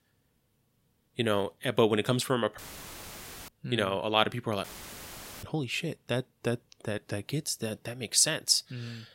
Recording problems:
audio cutting out; filled with static; at 2.5 s for 1 s and at 4.5 s for 1 s

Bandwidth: 16 kHz